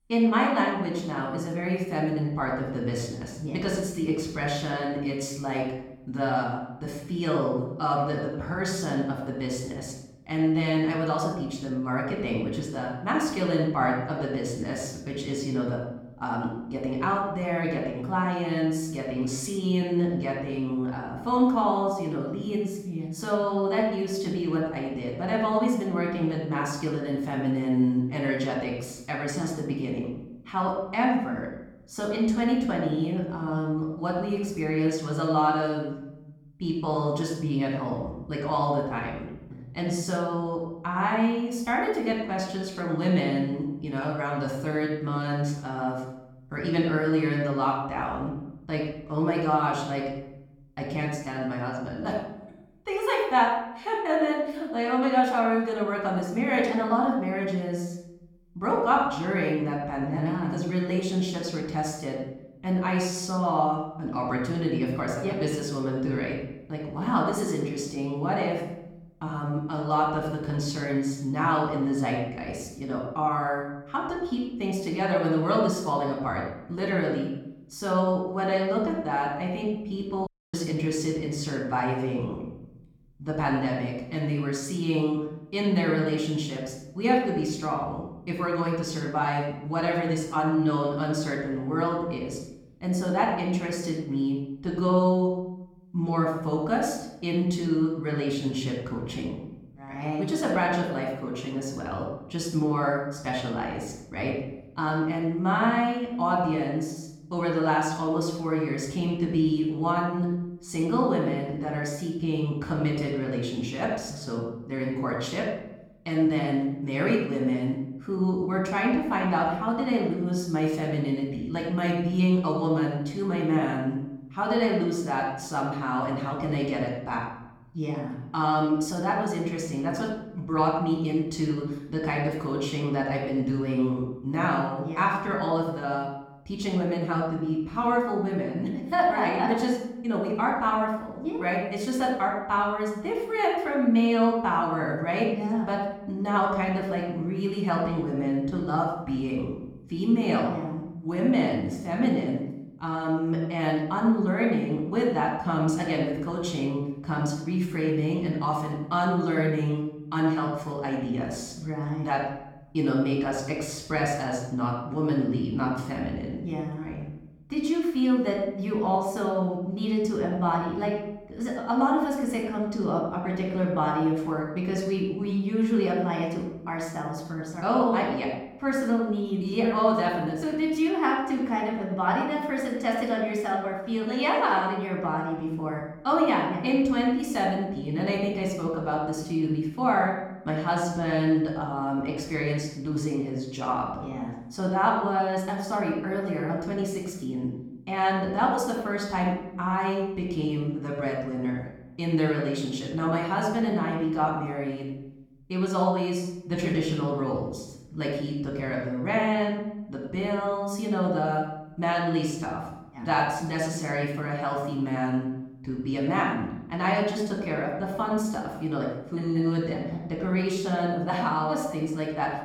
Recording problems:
off-mic speech; far
room echo; noticeable; dies away in 0.8 s
audio cutting out; at 1:20

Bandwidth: 17.5 kHz